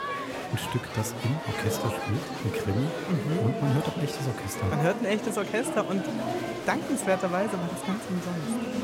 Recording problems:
murmuring crowd; loud; throughout; 3 dB below the speech

